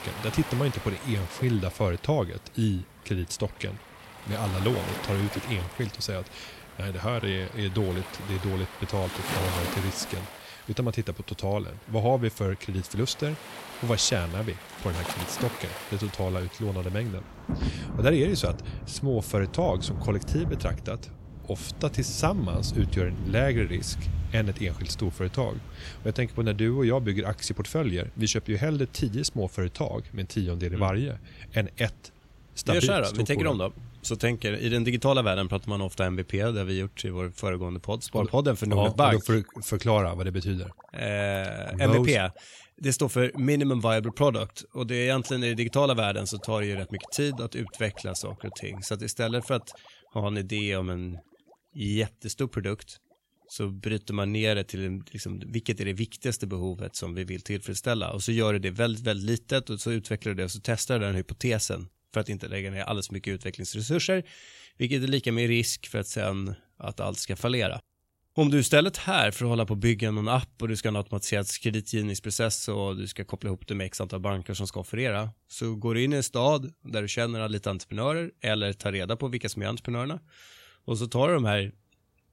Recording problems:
rain or running water; noticeable; throughout; 10 dB below the speech

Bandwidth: 16 kHz